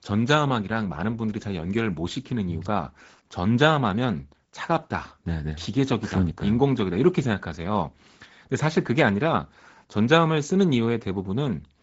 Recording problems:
garbled, watery; slightly; nothing above 7.5 kHz
high frequencies cut off; slight

